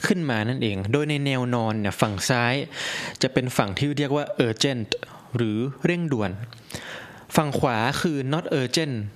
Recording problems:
squashed, flat; heavily

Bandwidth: 14.5 kHz